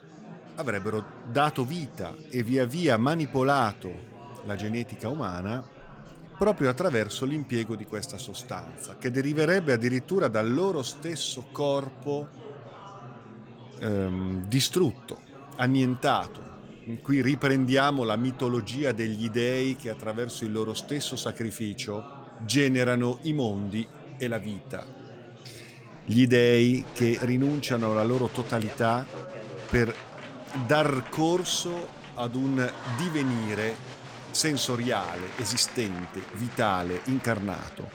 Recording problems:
murmuring crowd; noticeable; throughout; 15 dB below the speech

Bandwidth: 18.5 kHz